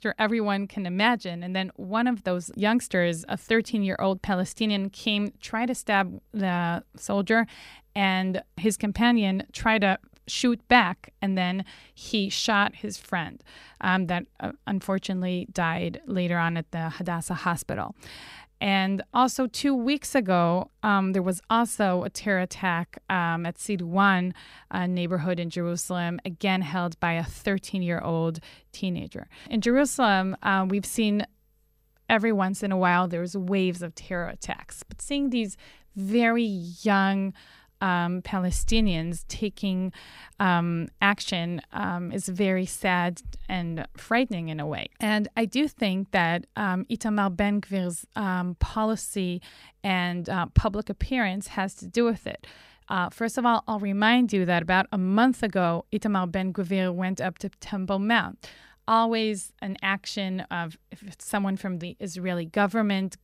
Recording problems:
none

